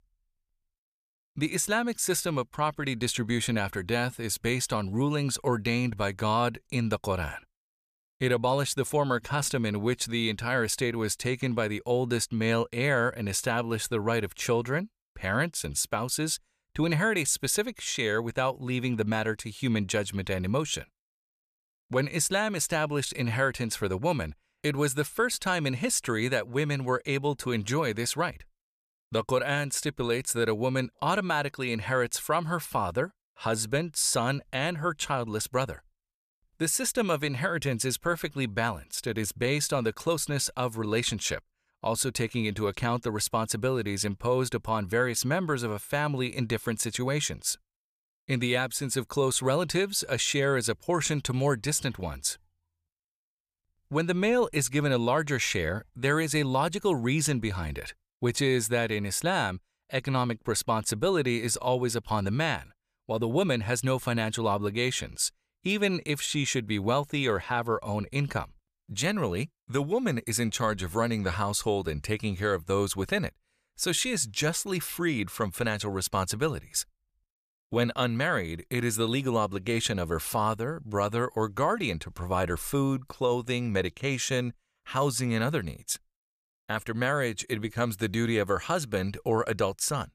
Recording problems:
none

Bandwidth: 14.5 kHz